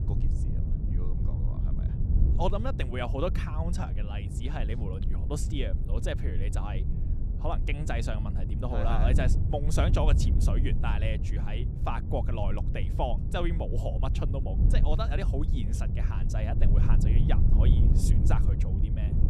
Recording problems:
wind noise on the microphone; heavy; 7 dB below the speech

